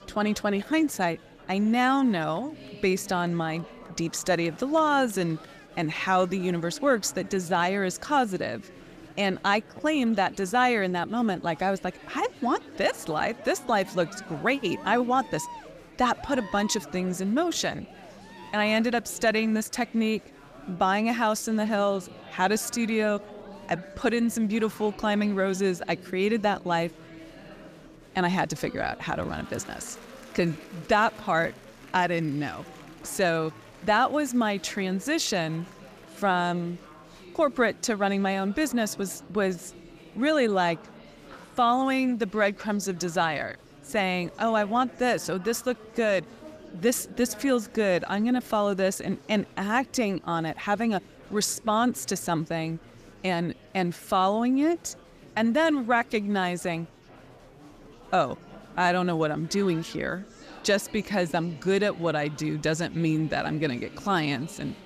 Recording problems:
murmuring crowd; noticeable; throughout; 20 dB below the speech

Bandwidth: 14.5 kHz